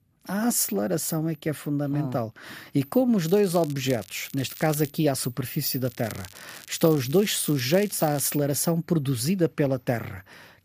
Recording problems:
crackling; noticeable; from 3 to 5 s and from 6 to 8 s; 20 dB below the speech

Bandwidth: 15 kHz